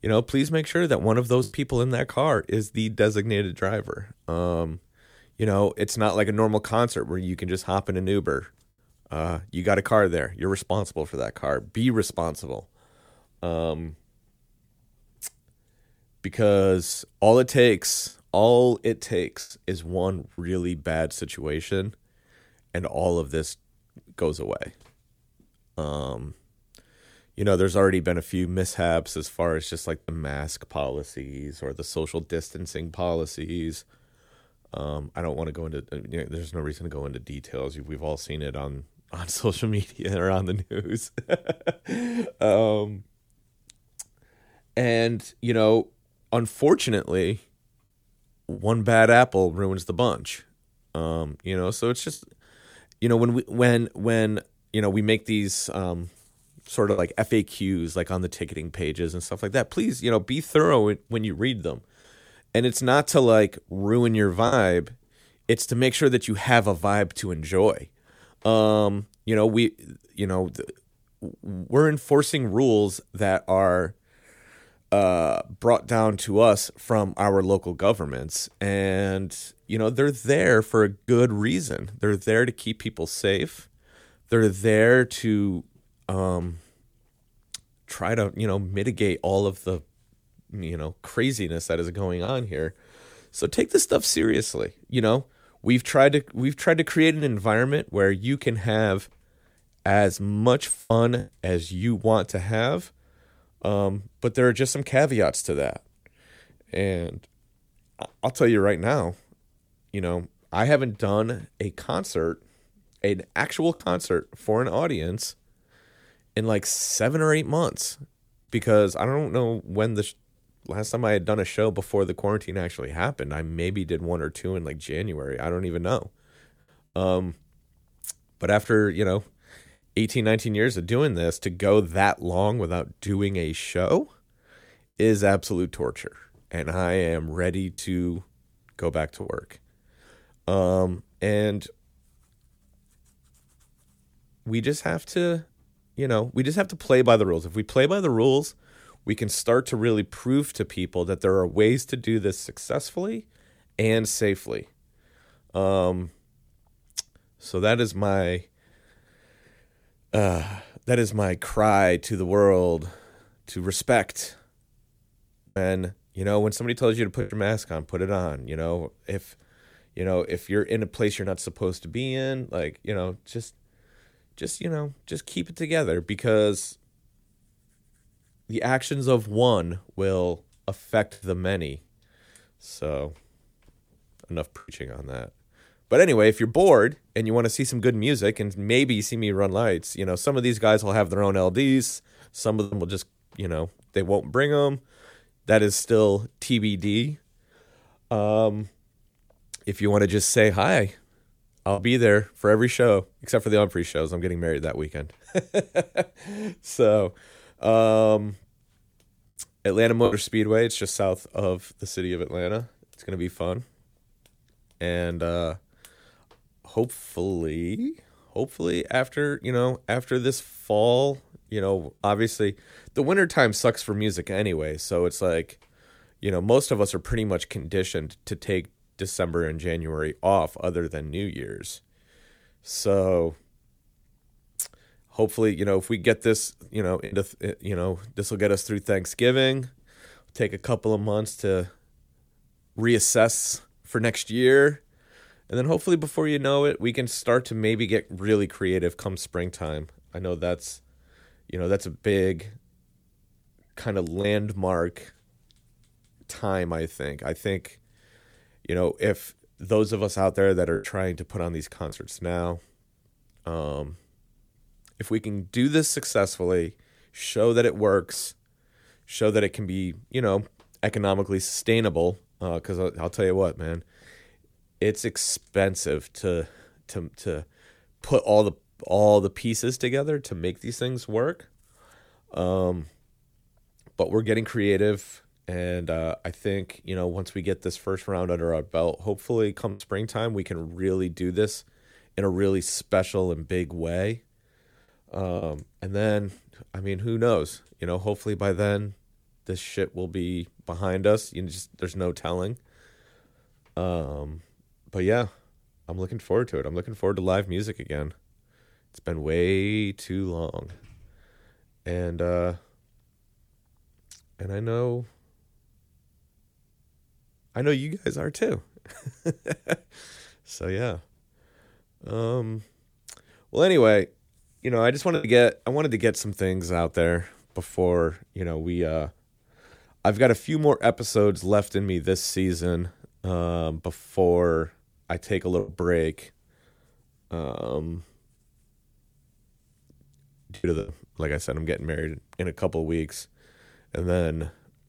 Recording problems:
choppy; occasionally; 1% of the speech affected

